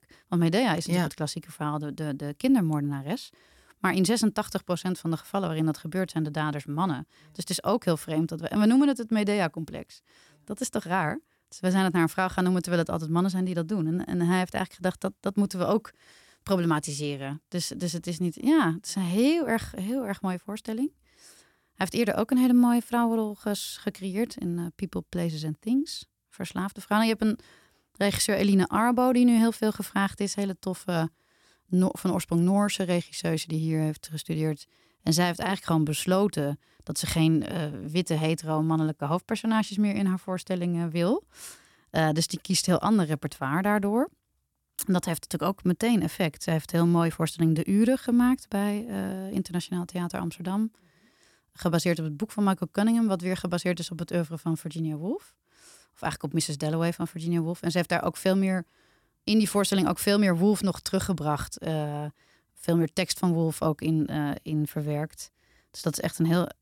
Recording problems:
none

